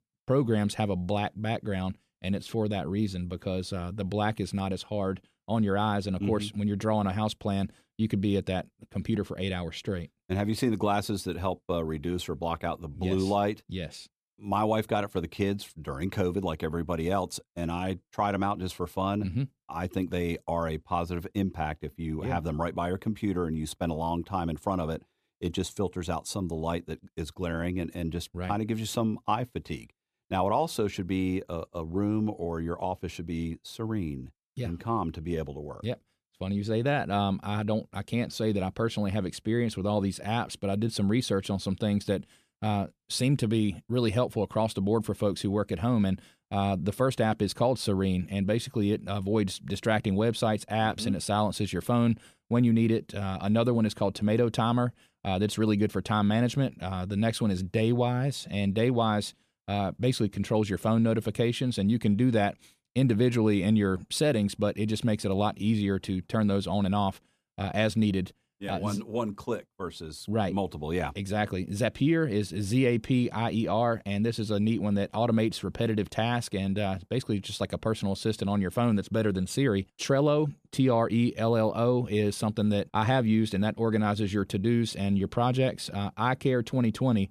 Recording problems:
none

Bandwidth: 14.5 kHz